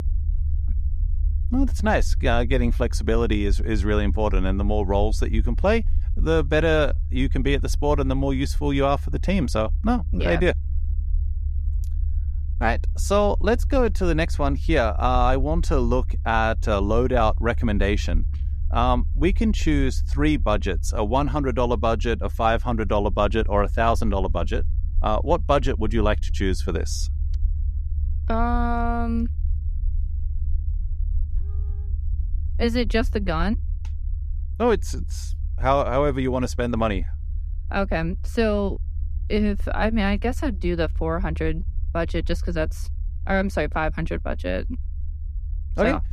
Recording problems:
low rumble; faint; throughout; 25 dB below the speech

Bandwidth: 14.5 kHz